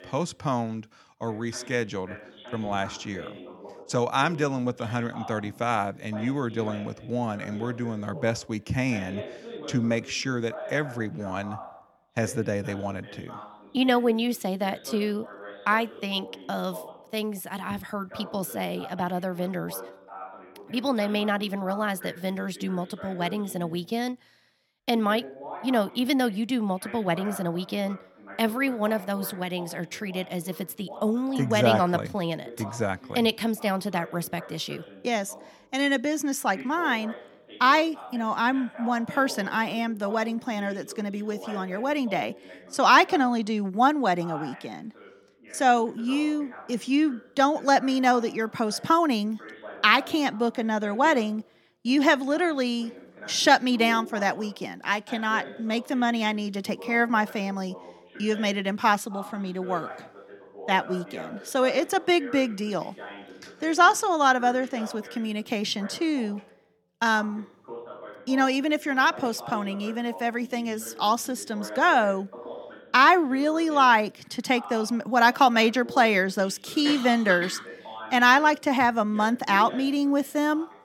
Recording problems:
voice in the background; noticeable; throughout; 20 dB below the speech

